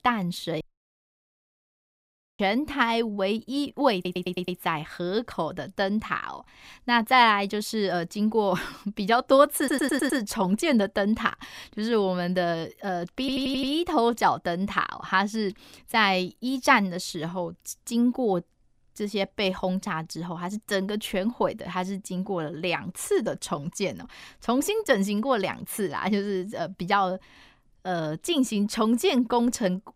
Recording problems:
audio cutting out; at 0.5 s for 2 s
audio stuttering; at 4 s, at 9.5 s and at 13 s

